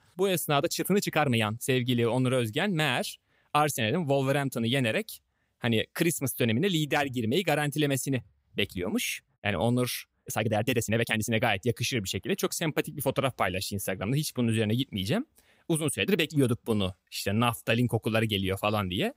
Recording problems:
uneven, jittery; strongly; from 0.5 to 18 s

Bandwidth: 15.5 kHz